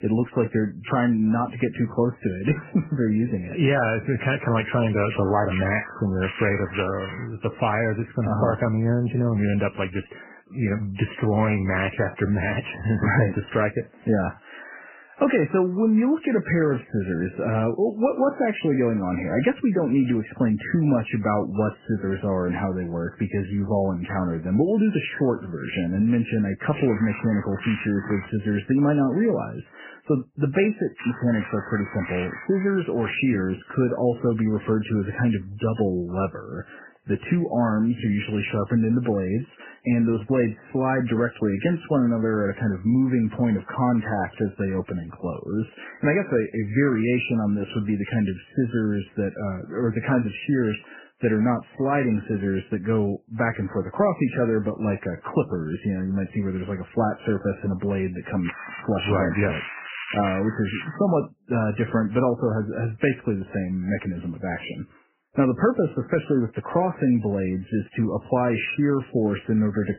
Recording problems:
garbled, watery; badly; nothing above 3 kHz
crackling; loud; 4 times, first at 5 s; 9 dB below the speech

